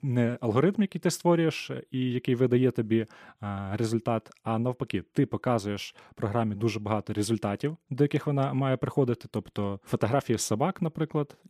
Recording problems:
none

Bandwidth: 14.5 kHz